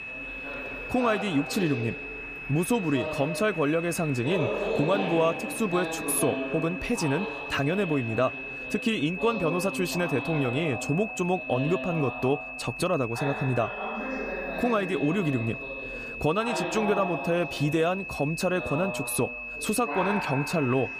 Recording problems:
high-pitched whine; loud; throughout; 2.5 kHz, 8 dB below the speech
voice in the background; loud; throughout; 8 dB below the speech
train or aircraft noise; faint; throughout; 20 dB below the speech

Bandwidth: 15 kHz